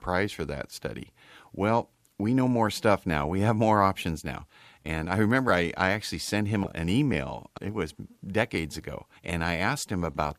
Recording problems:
none

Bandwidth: 14.5 kHz